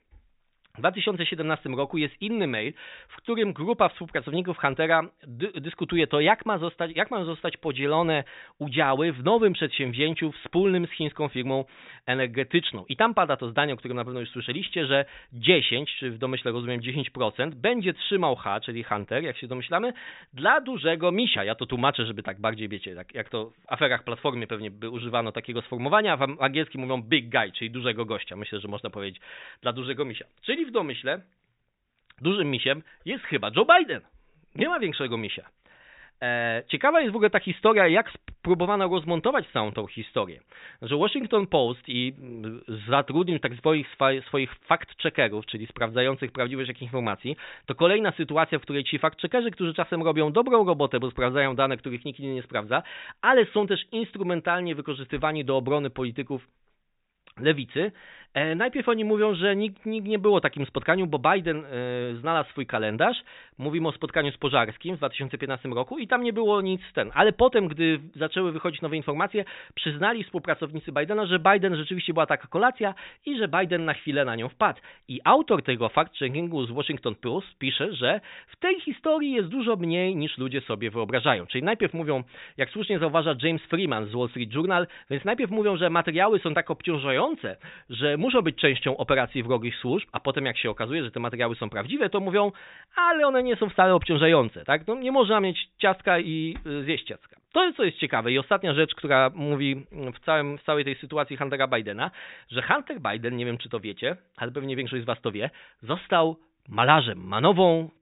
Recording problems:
high frequencies cut off; severe; nothing above 4 kHz

